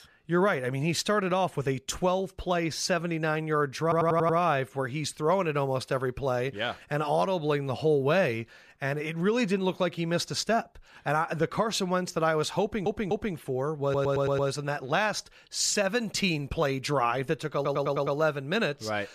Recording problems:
audio stuttering; 4 times, first at 4 s

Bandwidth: 14.5 kHz